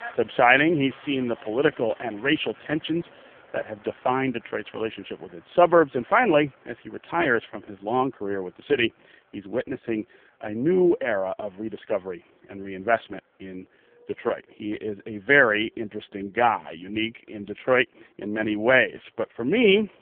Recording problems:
phone-call audio; poor line; nothing above 3 kHz
traffic noise; faint; throughout; 25 dB below the speech

